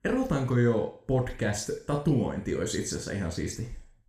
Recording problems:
room echo; slight; dies away in 0.5 s
off-mic speech; somewhat distant

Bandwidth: 15 kHz